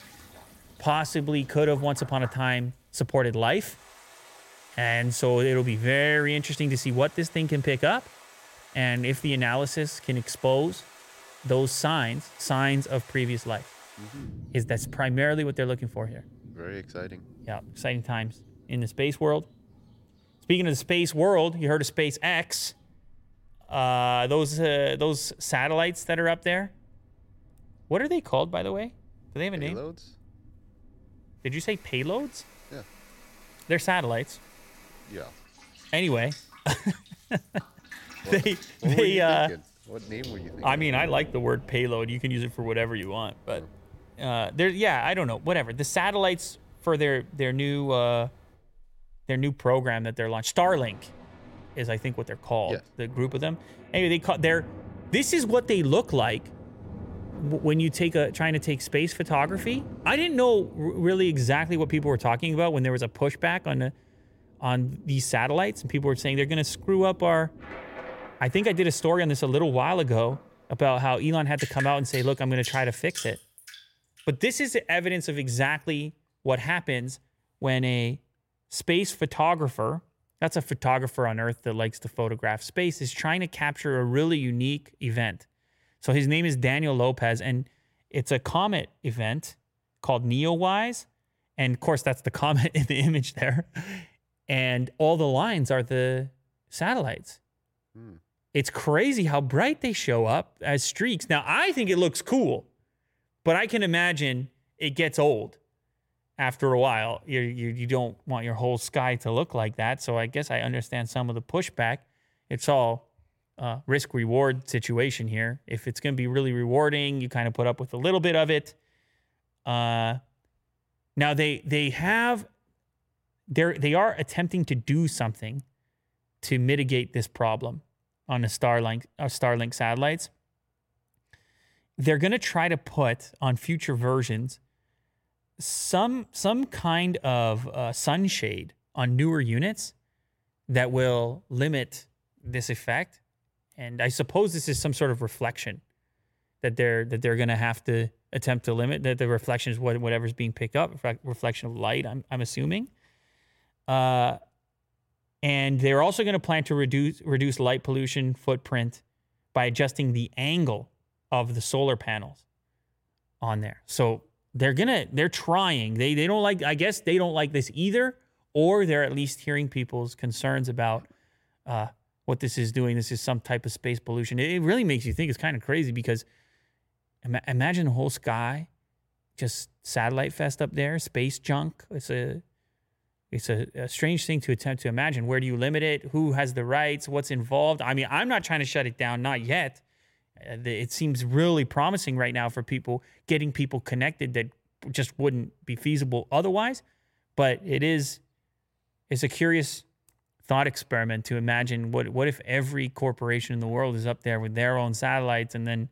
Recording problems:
rain or running water; noticeable; until 1:14; 20 dB below the speech

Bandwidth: 16.5 kHz